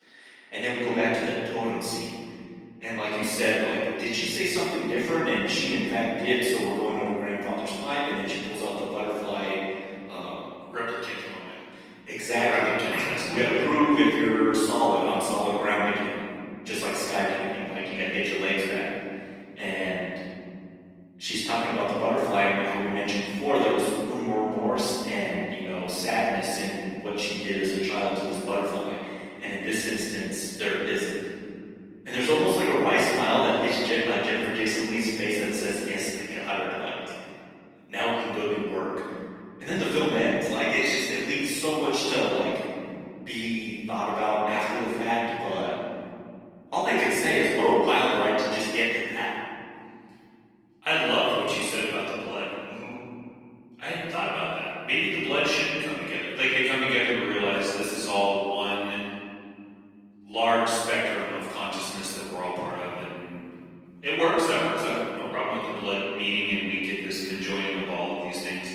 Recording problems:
room echo; strong; dies away in 3 s
off-mic speech; far
thin; somewhat; fading below 300 Hz
garbled, watery; slightly

